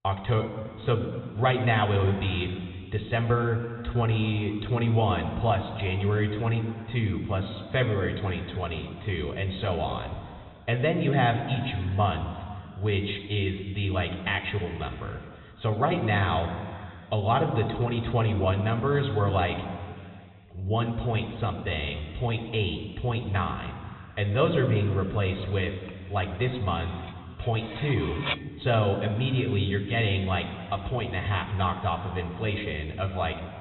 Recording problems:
high frequencies cut off; severe; nothing above 4 kHz
room echo; noticeable; dies away in 2.1 s
off-mic speech; somewhat distant
clattering dishes; noticeable; from 26 to 28 s; peak 3 dB below the speech

